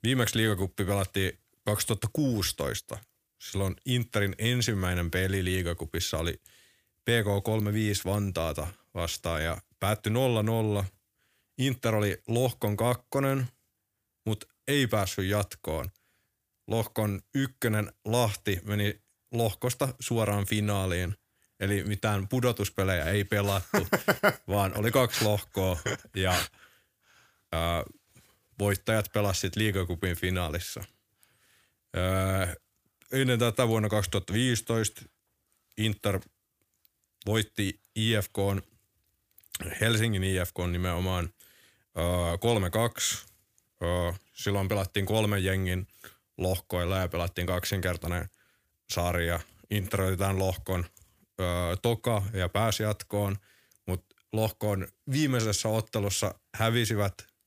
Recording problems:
none

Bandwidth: 15 kHz